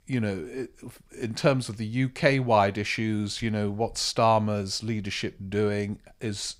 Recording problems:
none

